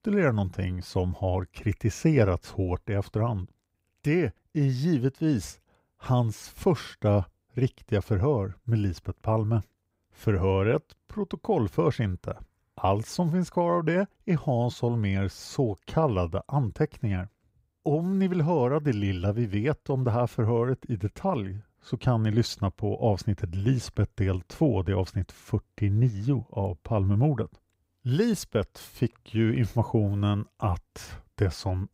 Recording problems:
none

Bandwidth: 15.5 kHz